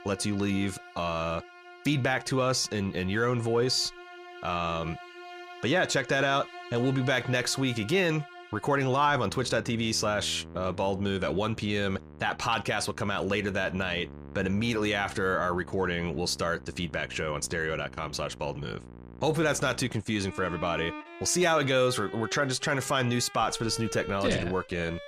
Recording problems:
background music; noticeable; throughout; 15 dB below the speech

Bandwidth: 15 kHz